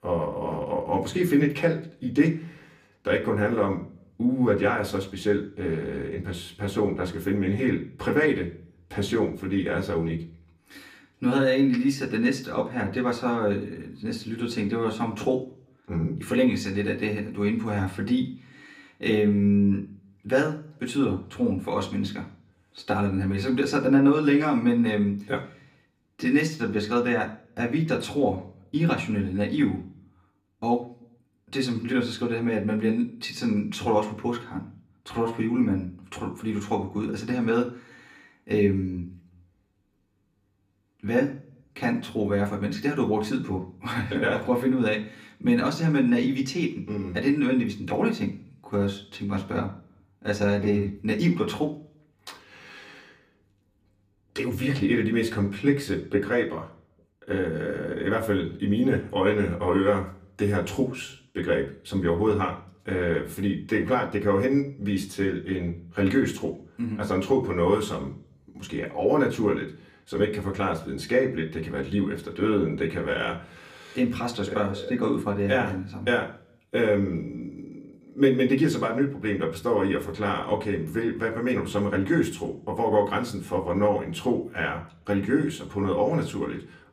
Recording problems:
off-mic speech; far
room echo; very slight; dies away in 0.4 s

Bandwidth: 15 kHz